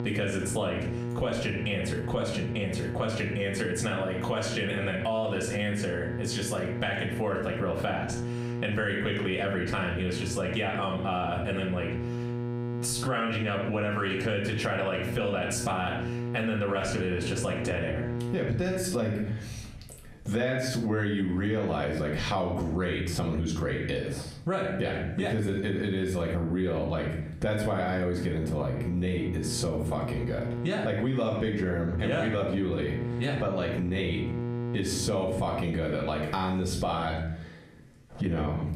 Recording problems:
off-mic speech; far
squashed, flat; heavily
room echo; slight; dies away in 0.4 s
electrical hum; noticeable; until 19 s and from 27 to 36 s; 60 Hz, 10 dB below the speech

